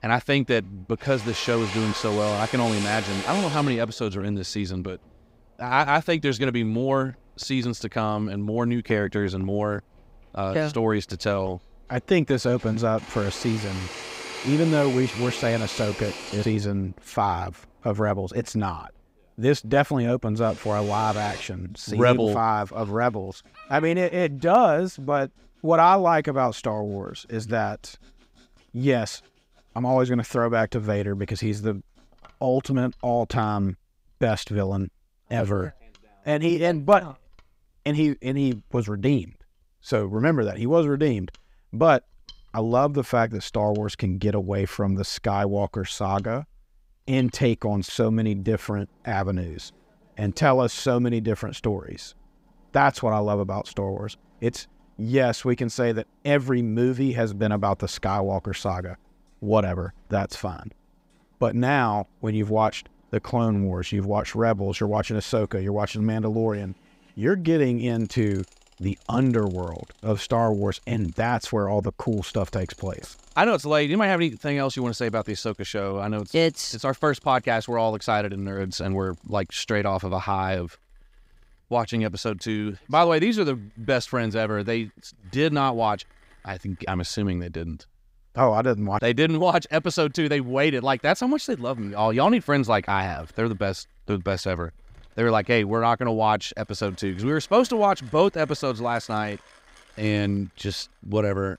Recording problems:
machinery noise; noticeable; throughout; 15 dB below the speech

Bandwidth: 15.5 kHz